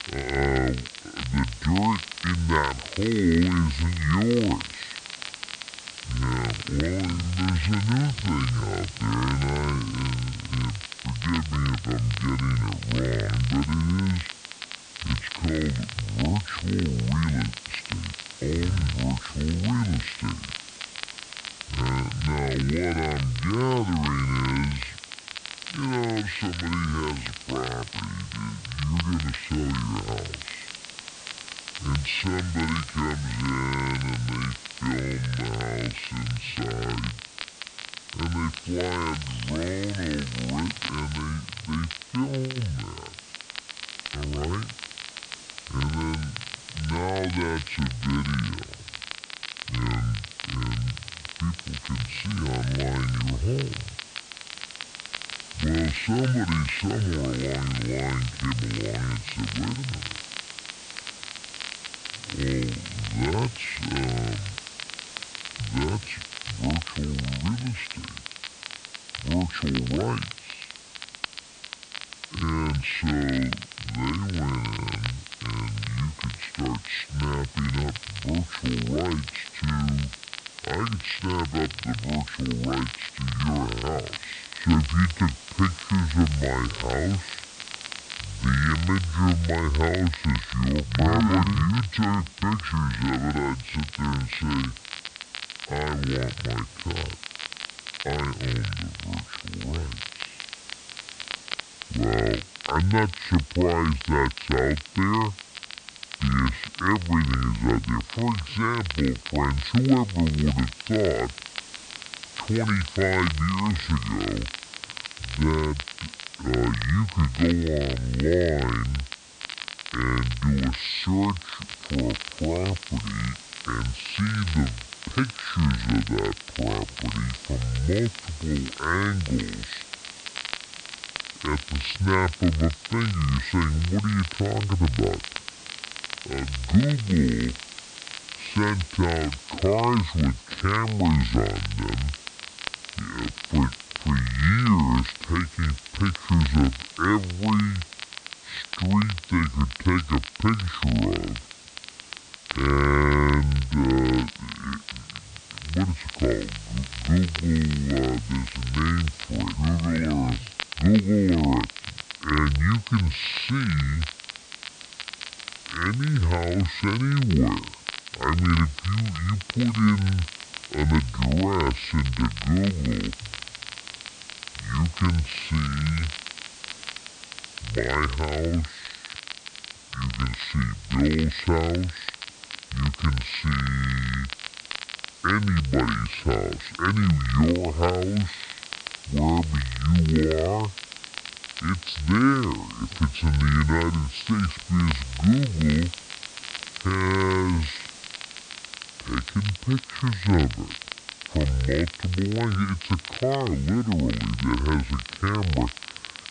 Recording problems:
wrong speed and pitch; too slow and too low; 0.6 times normal speed
high frequencies cut off; noticeable; nothing above 5 kHz
hiss; noticeable; throughout; 15 dB below the speech
crackle, like an old record; noticeable; 10 dB below the speech

